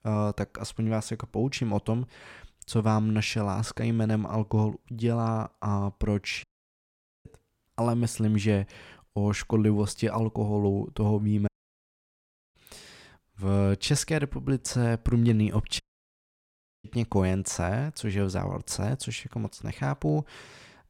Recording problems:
audio cutting out; at 6.5 s for 1 s, at 11 s for 1 s and at 16 s for 1 s

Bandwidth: 16.5 kHz